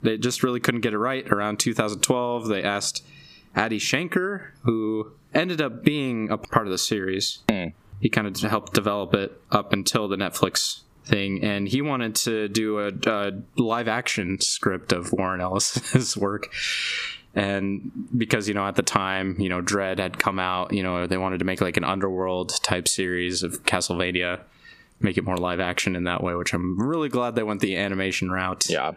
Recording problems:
squashed, flat; somewhat

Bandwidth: 15 kHz